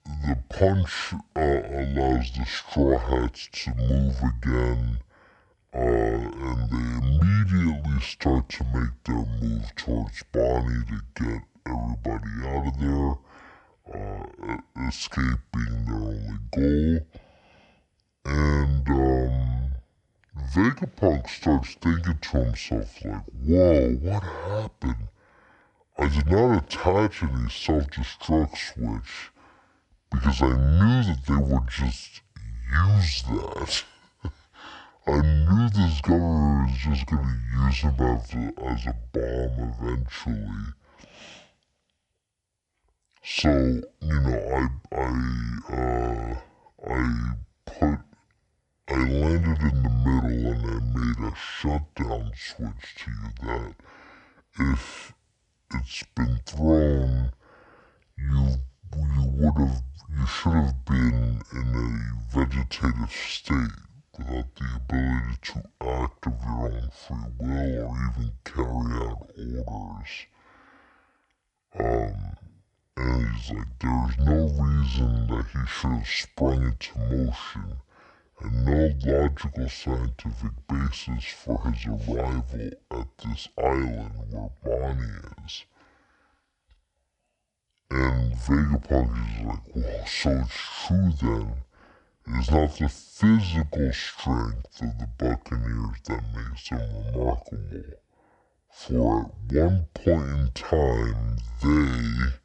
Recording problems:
wrong speed and pitch; too slow and too low; 0.6 times normal speed

